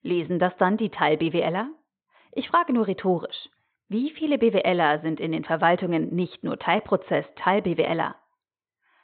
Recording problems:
high frequencies cut off; severe; nothing above 4 kHz

